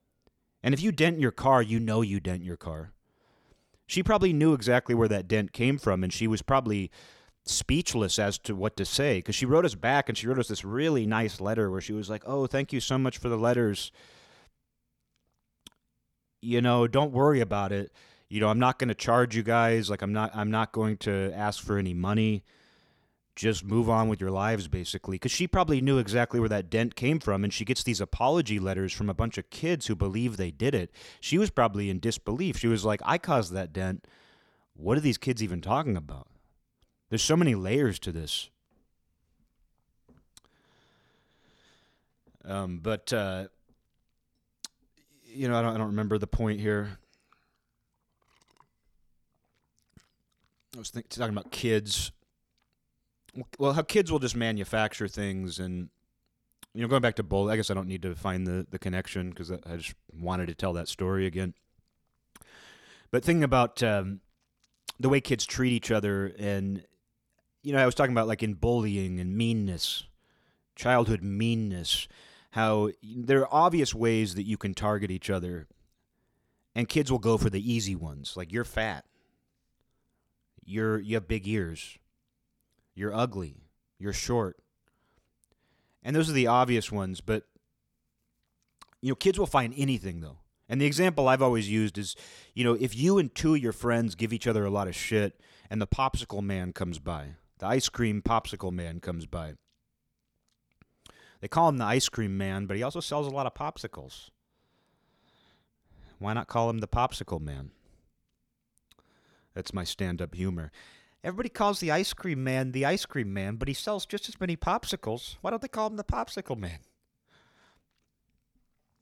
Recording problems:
none

